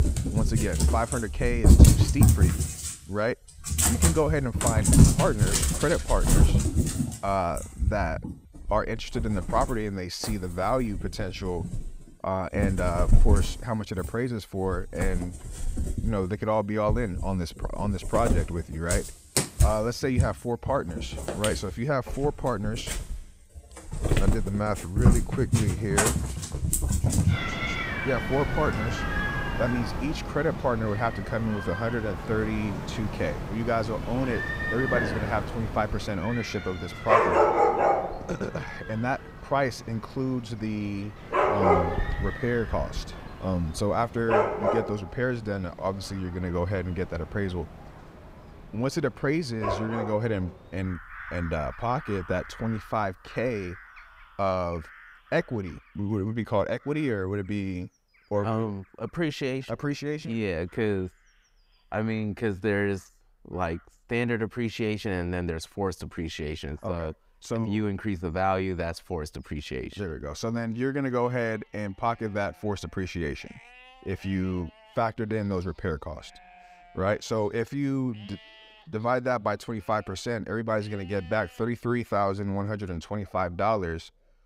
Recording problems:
animal sounds; very loud; throughout; 3 dB above the speech

